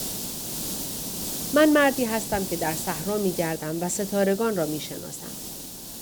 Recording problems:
hiss; loud; throughout; 7 dB below the speech

